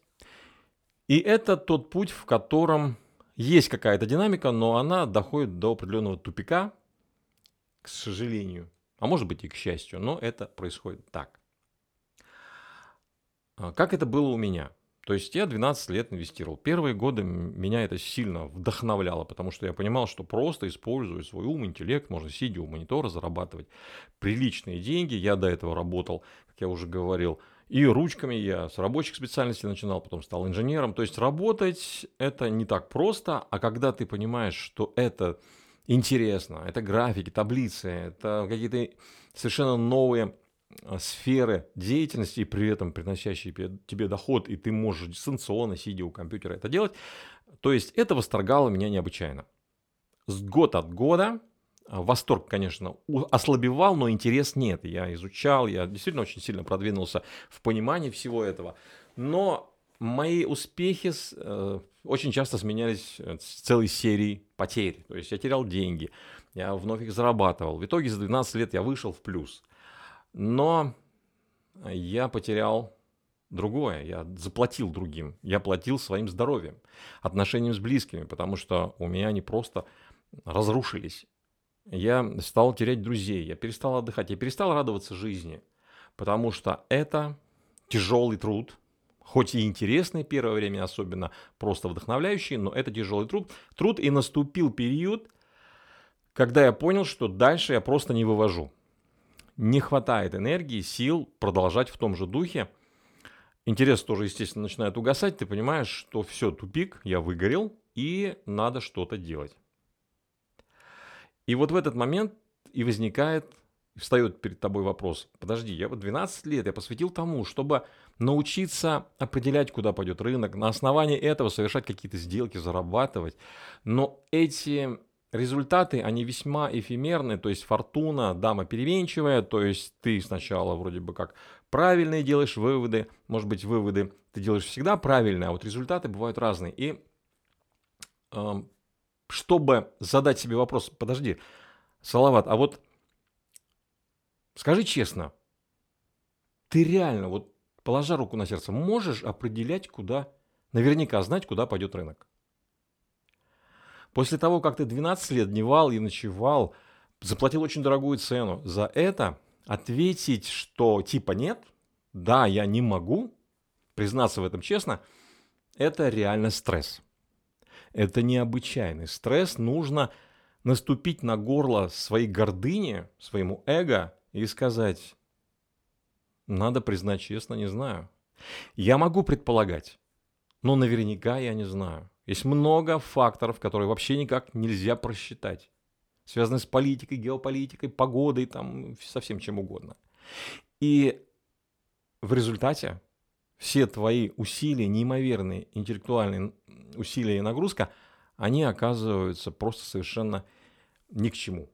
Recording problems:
none

